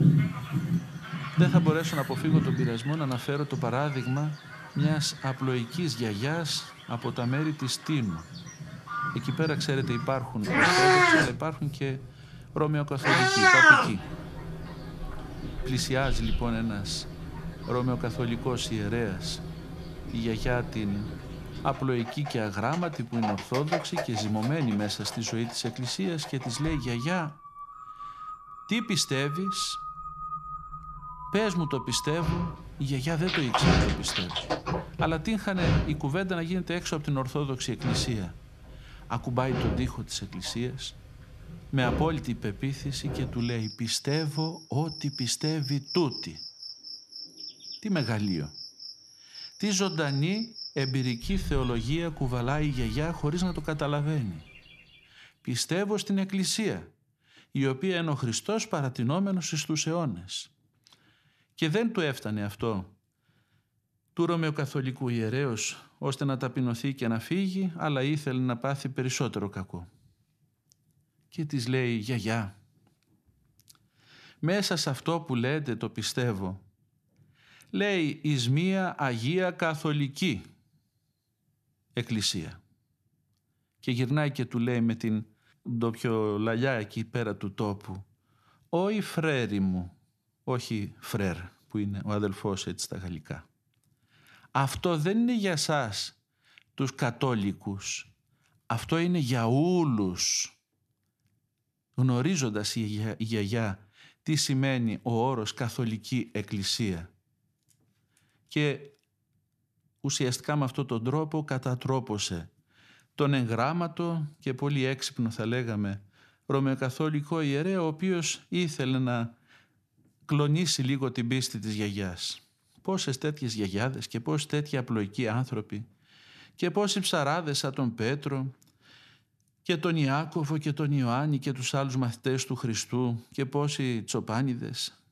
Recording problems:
animal sounds; very loud; until 55 s; as loud as the speech

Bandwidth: 14 kHz